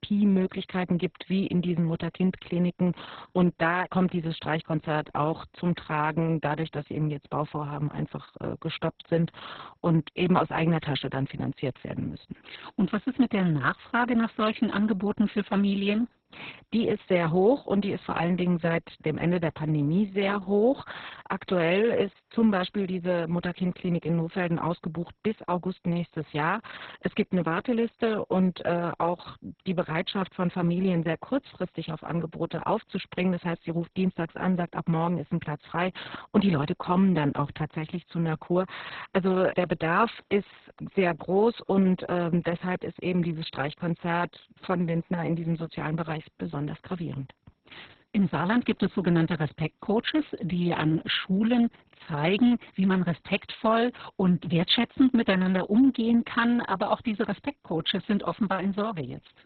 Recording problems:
garbled, watery; badly; nothing above 4 kHz

